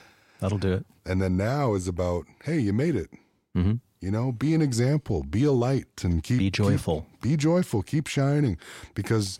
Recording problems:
none

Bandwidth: 16 kHz